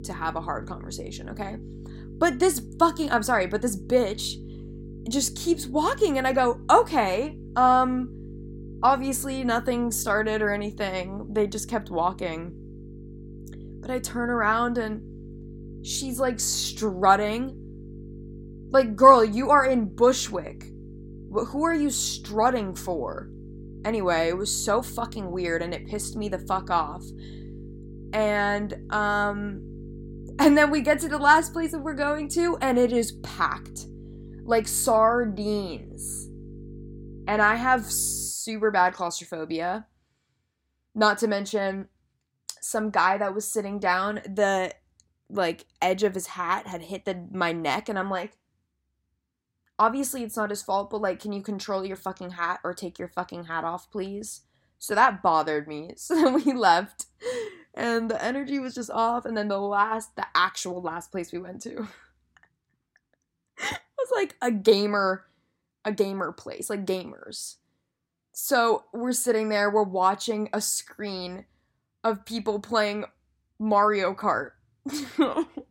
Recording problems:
electrical hum; faint; until 38 s; 50 Hz, 25 dB below the speech

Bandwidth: 16 kHz